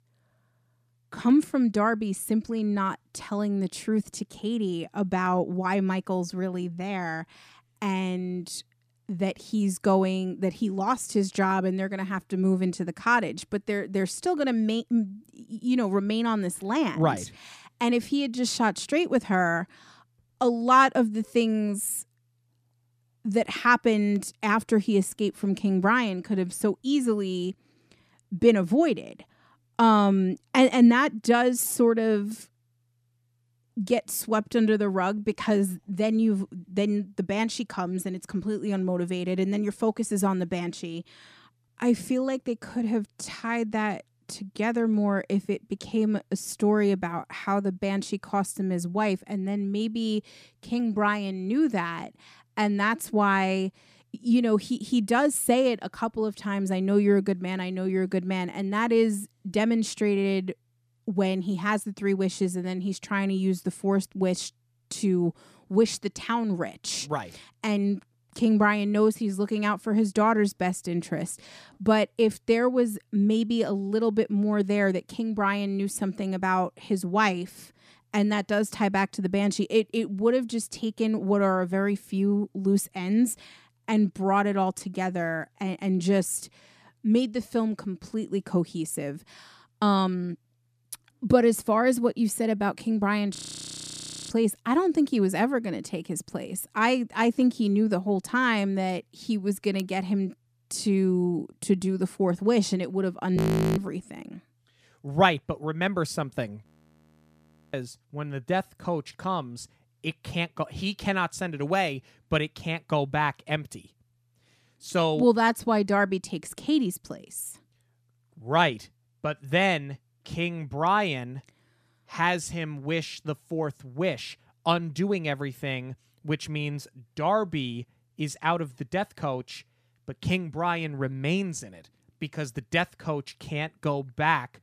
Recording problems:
audio freezing; at 1:33 for 1 s, at 1:43 and at 1:47 for 1 s

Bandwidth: 14.5 kHz